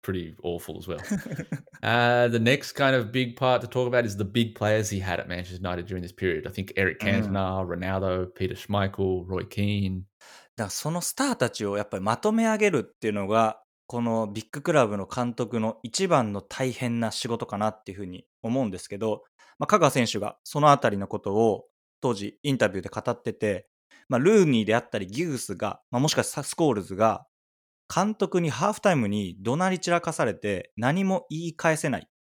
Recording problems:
none

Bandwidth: 17 kHz